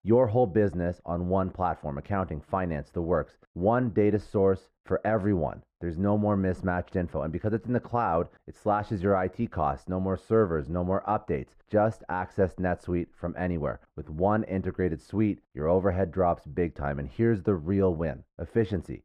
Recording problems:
muffled; very; fading above 2 kHz

